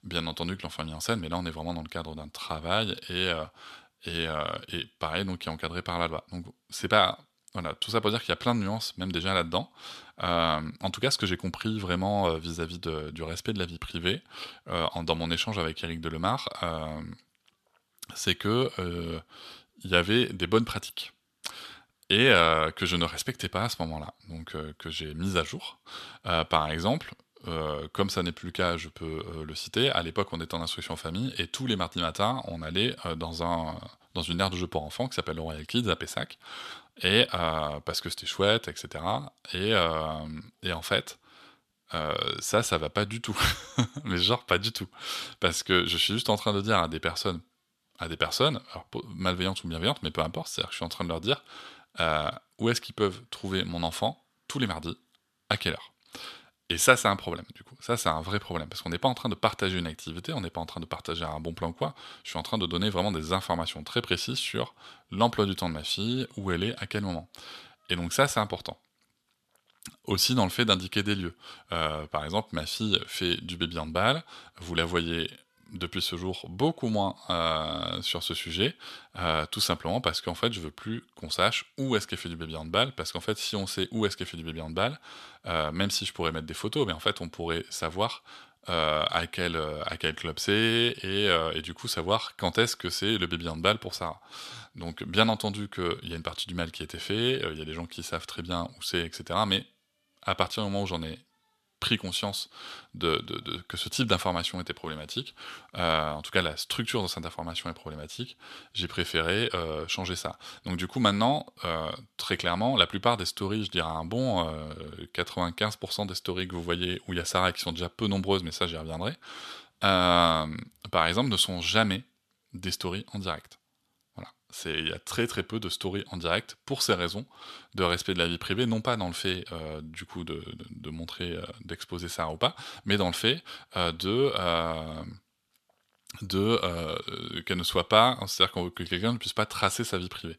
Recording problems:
thin; somewhat; fading below 350 Hz

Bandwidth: 13.5 kHz